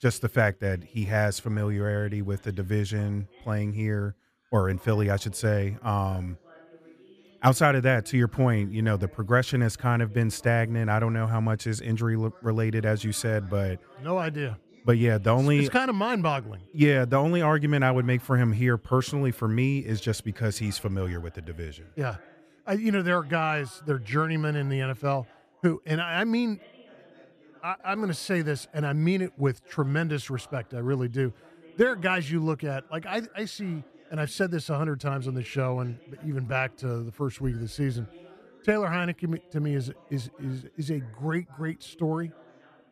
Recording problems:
background chatter; faint; throughout; 2 voices, 25 dB below the speech

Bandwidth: 14.5 kHz